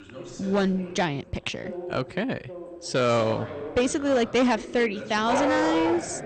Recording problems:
distortion; slight; 6% of the sound clipped
garbled, watery; slightly; nothing above 8.5 kHz
animal sounds; loud; throughout; 1 dB below the speech
background chatter; noticeable; throughout; 2 voices, 15 dB below the speech

